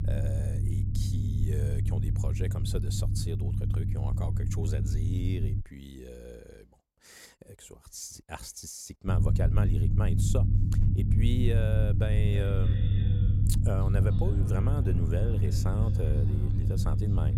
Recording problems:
echo of what is said; noticeable; from 12 s on; 290 ms later, 15 dB below the speech
low rumble; loud; until 5.5 s and from 9 s on; 2 dB below the speech

